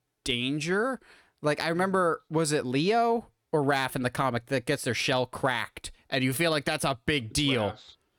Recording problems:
none

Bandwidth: 17.5 kHz